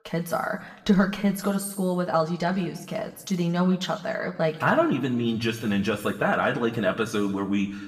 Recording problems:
room echo; slight; dies away in 0.9 s
off-mic speech; somewhat distant

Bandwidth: 15 kHz